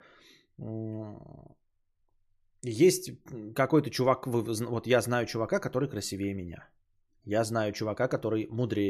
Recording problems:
abrupt cut into speech; at the end

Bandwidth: 14 kHz